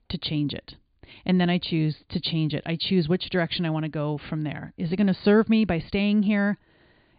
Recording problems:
high frequencies cut off; severe; nothing above 4.5 kHz

